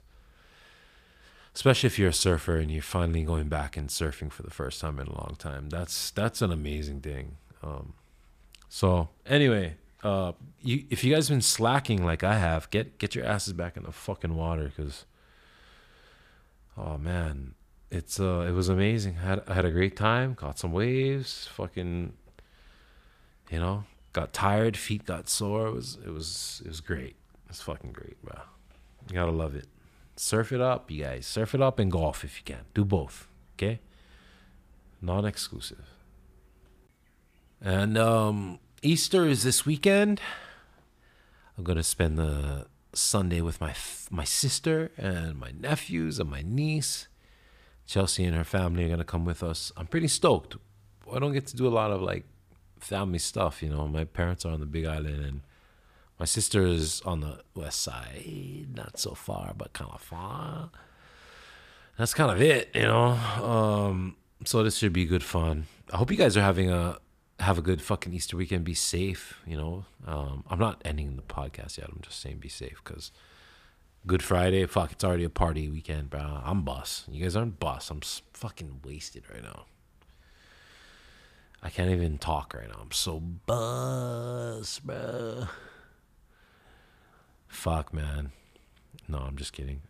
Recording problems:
none

